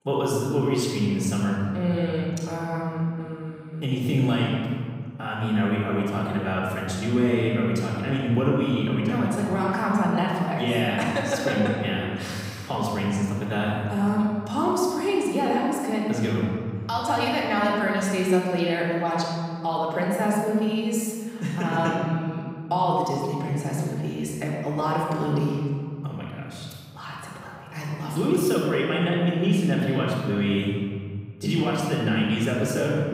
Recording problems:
room echo; strong; dies away in 2.1 s
off-mic speech; far

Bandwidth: 15.5 kHz